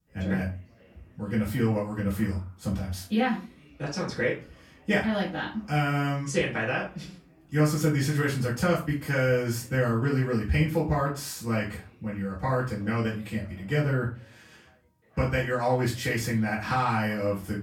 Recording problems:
off-mic speech; far
room echo; slight; dies away in 0.3 s
background chatter; faint; throughout; 3 voices, 30 dB below the speech

